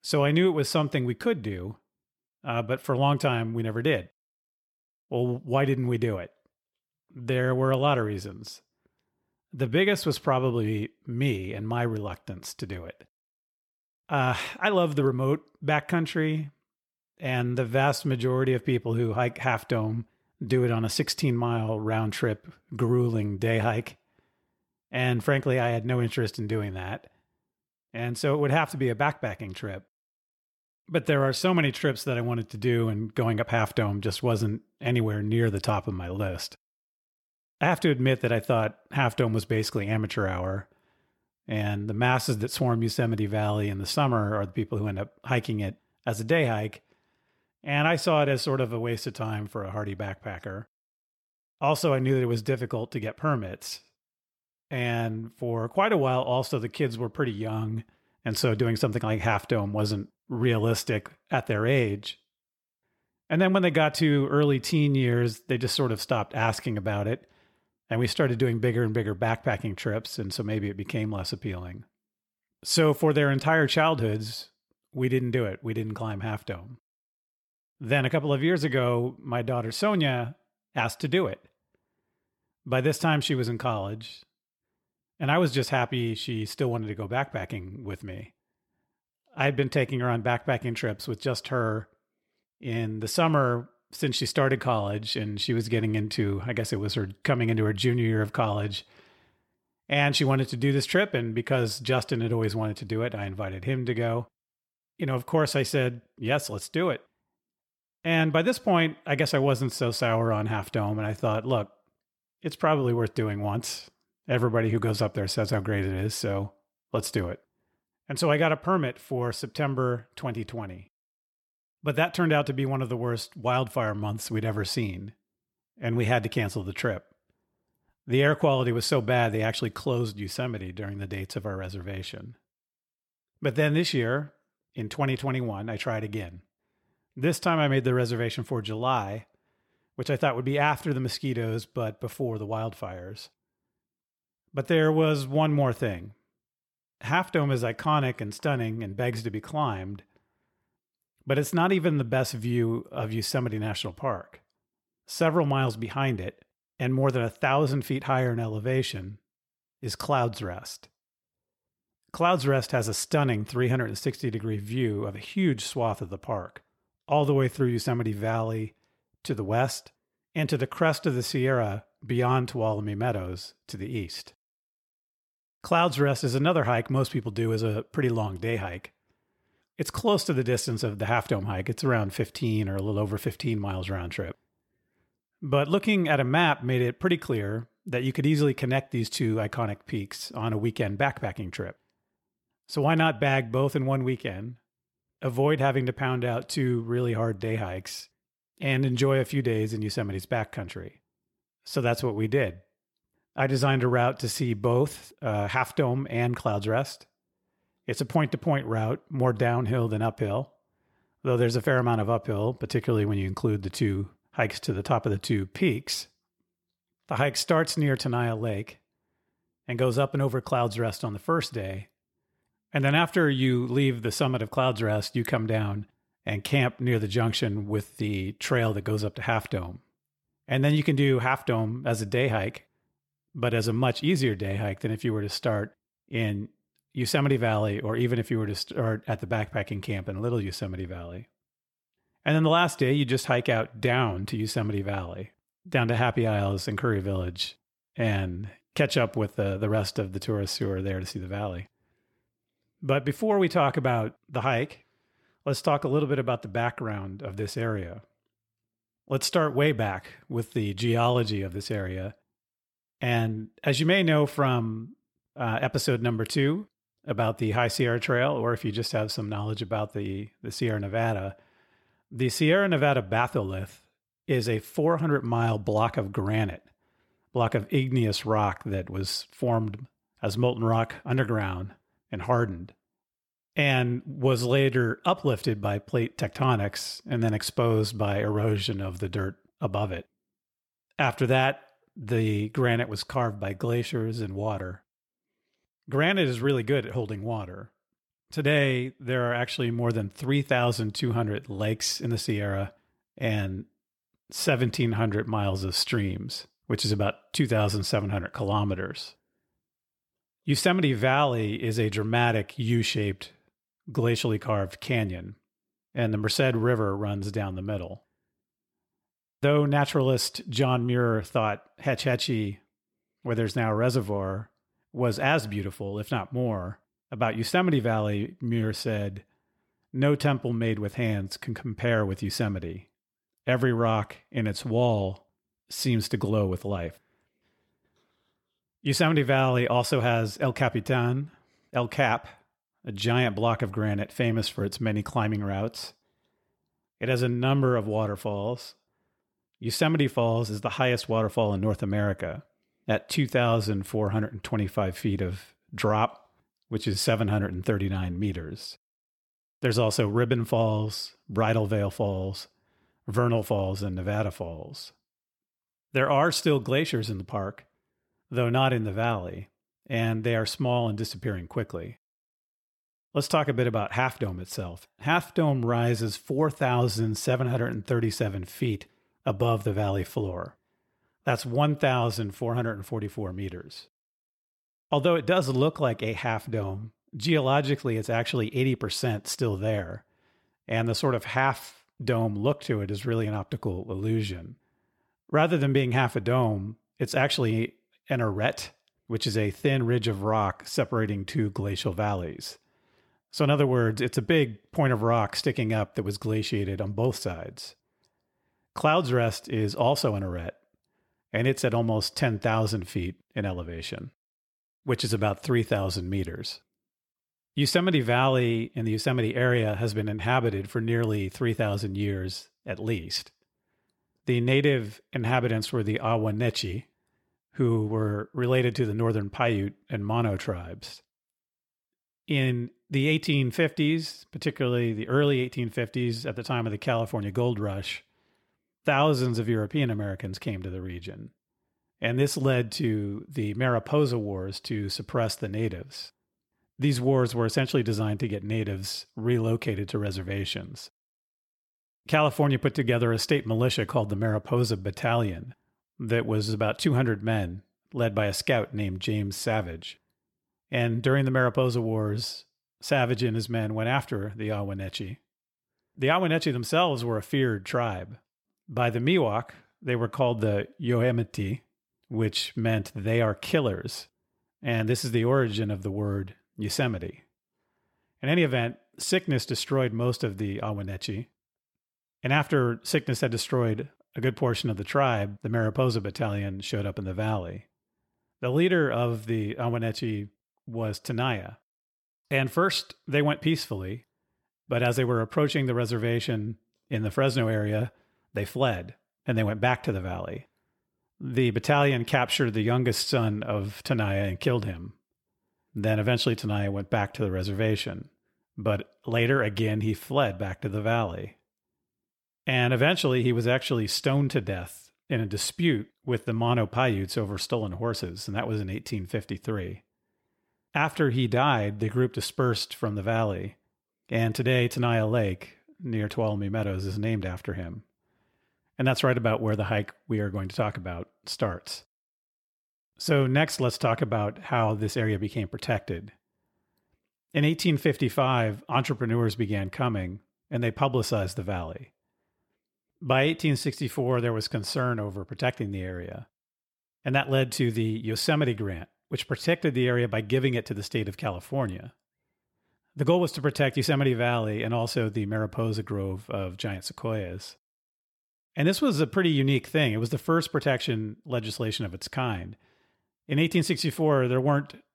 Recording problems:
none

